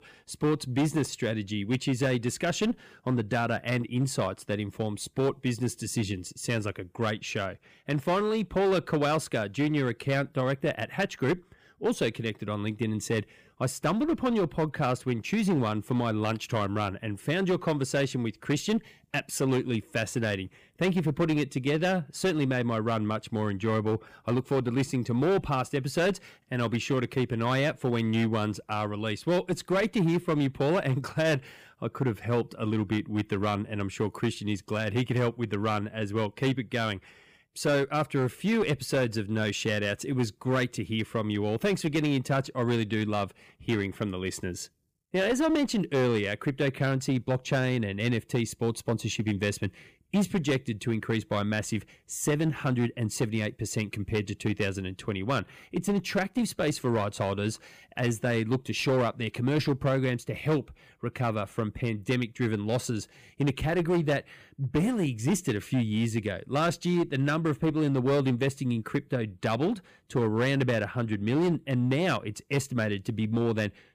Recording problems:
distortion; slight; 9% of the sound clipped

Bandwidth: 15 kHz